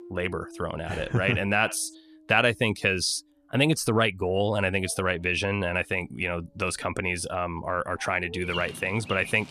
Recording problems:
animal sounds; noticeable; throughout; 15 dB below the speech

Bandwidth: 14.5 kHz